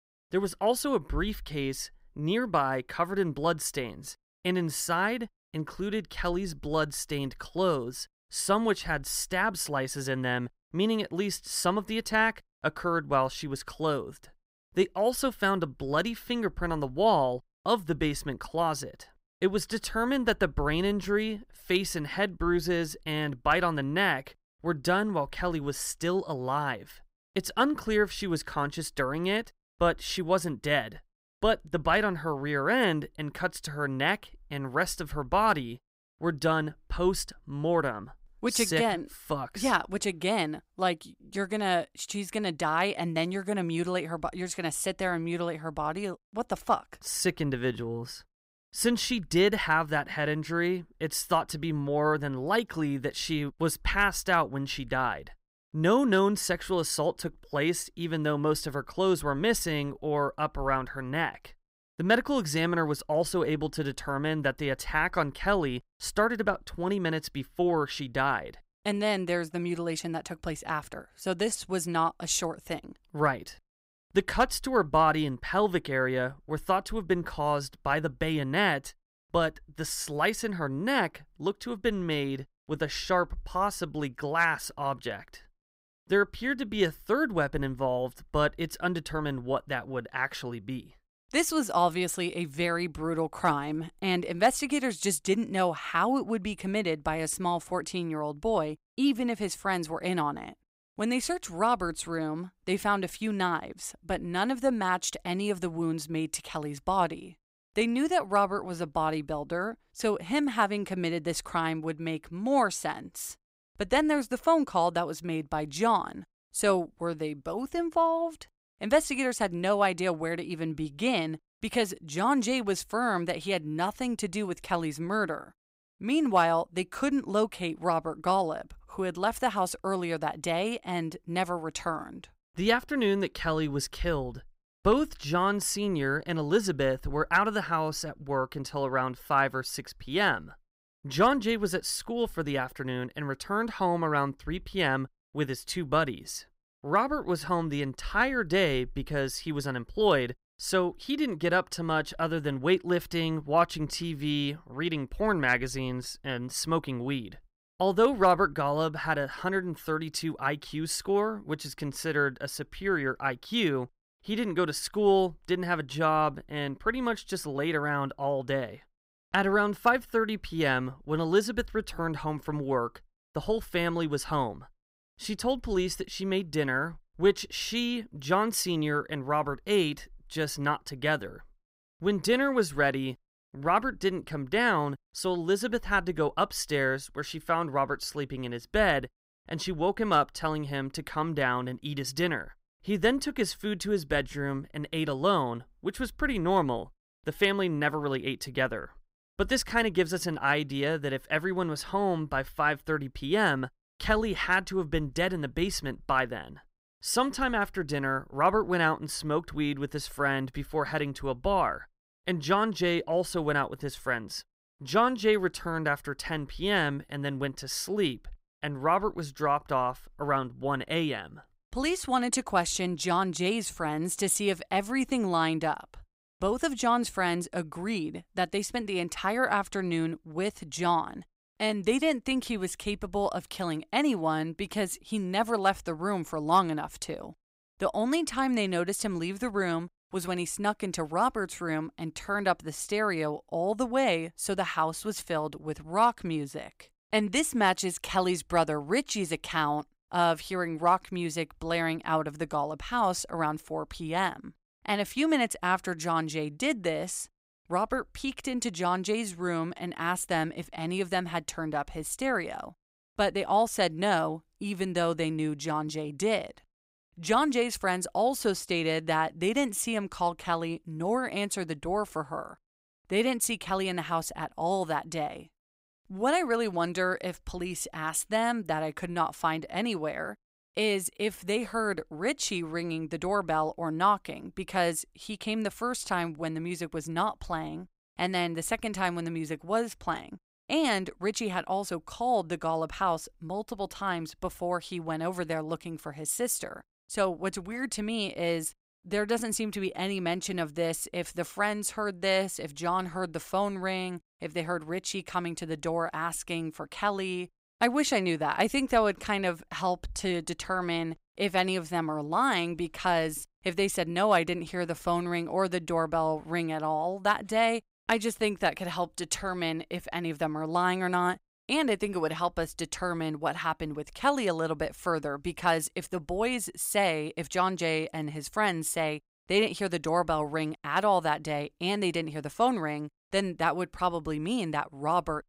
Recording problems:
none

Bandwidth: 15.5 kHz